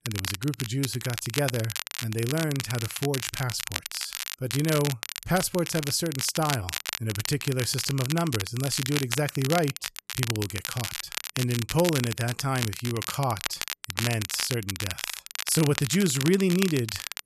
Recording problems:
crackle, like an old record; loud; 5 dB below the speech

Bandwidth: 14 kHz